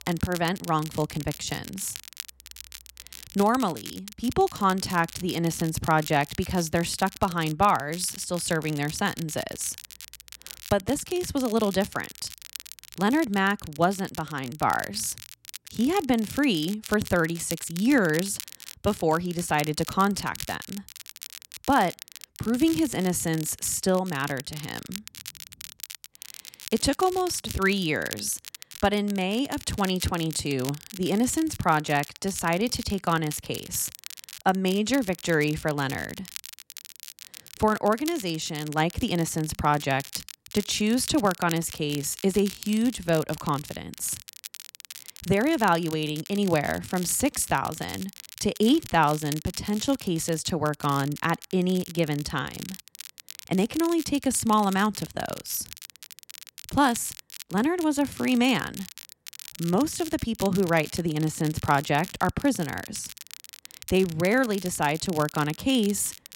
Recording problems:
crackle, like an old record; noticeable; 15 dB below the speech

